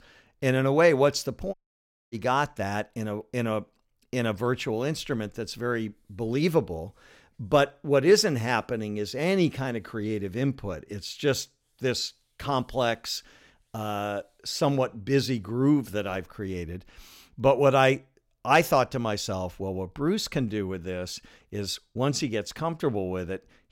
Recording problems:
audio cutting out; at 1.5 s for 0.5 s

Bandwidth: 16.5 kHz